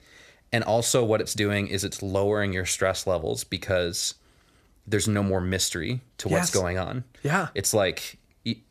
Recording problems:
none

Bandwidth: 14.5 kHz